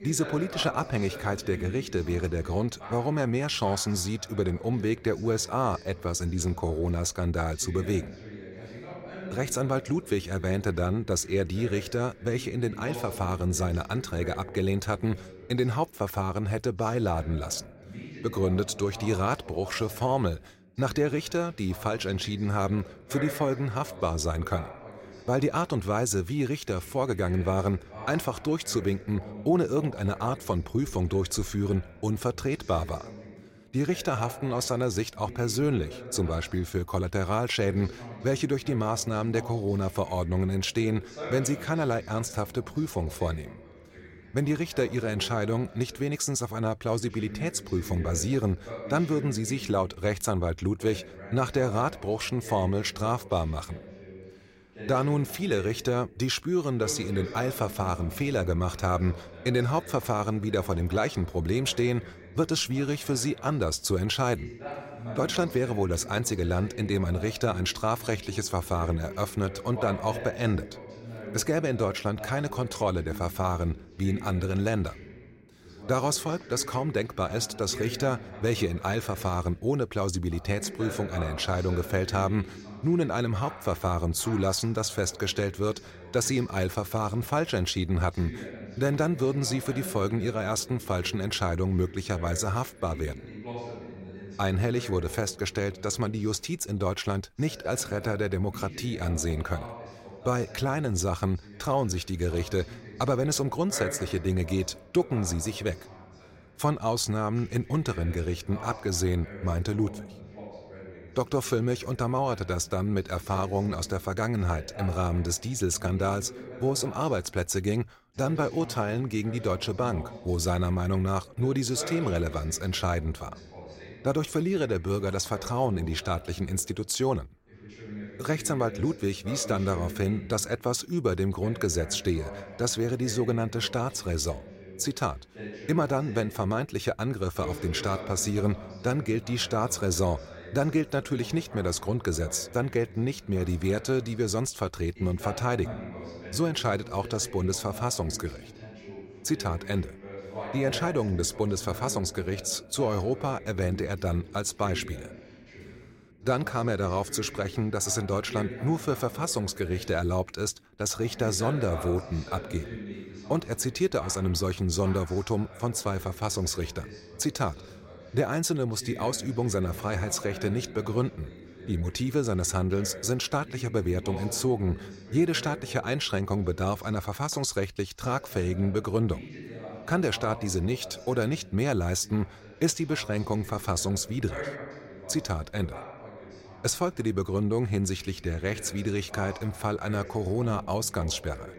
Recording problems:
voice in the background; noticeable; throughout; 15 dB below the speech

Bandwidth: 16 kHz